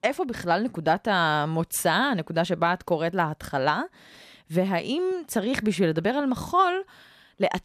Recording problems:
none

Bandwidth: 14.5 kHz